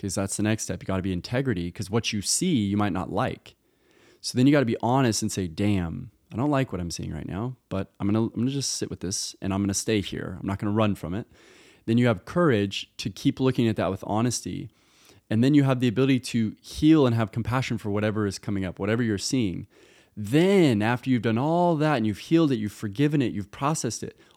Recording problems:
none

